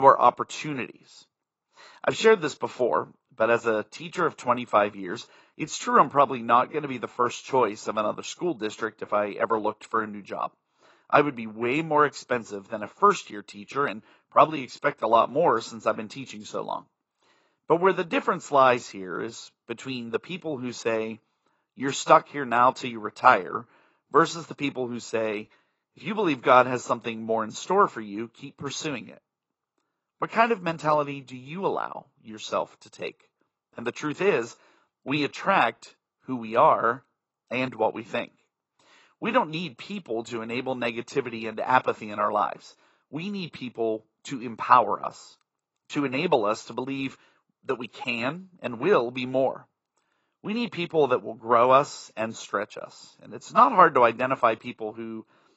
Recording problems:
garbled, watery; badly; nothing above 7.5 kHz
abrupt cut into speech; at the start

